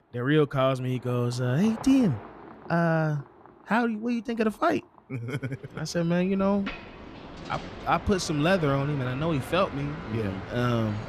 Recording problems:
traffic noise; noticeable; throughout; 15 dB below the speech

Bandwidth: 14.5 kHz